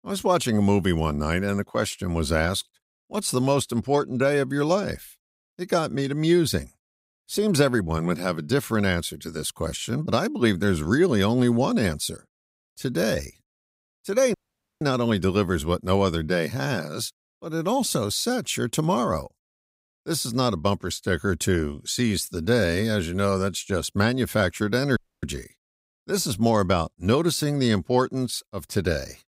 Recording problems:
audio cutting out; at 14 s and at 25 s

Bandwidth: 15.5 kHz